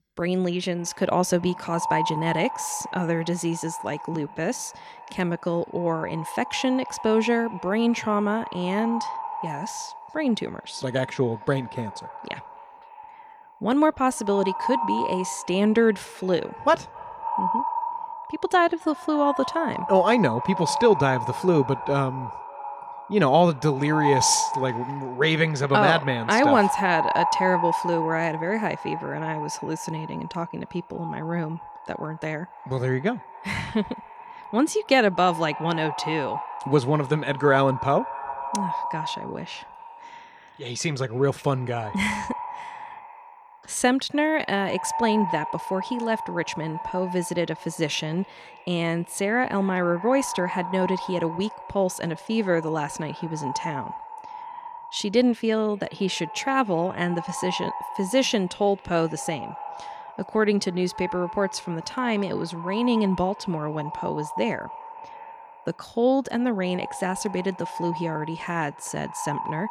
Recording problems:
echo of what is said; strong; throughout; 260 ms later, 8 dB below the speech

